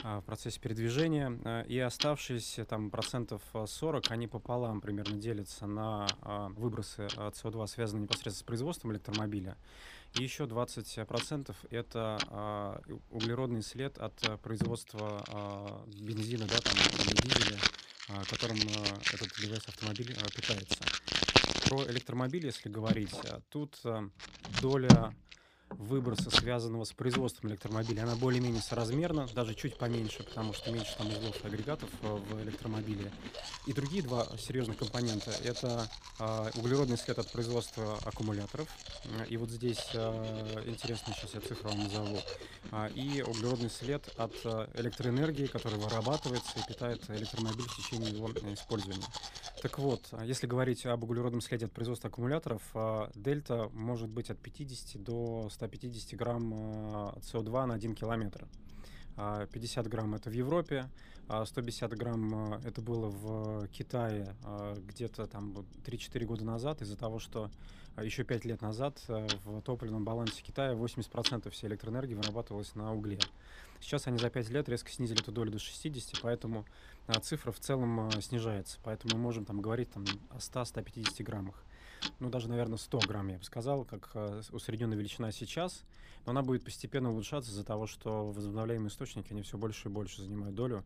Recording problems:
household noises; very loud; throughout; 1 dB above the speech

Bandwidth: 15 kHz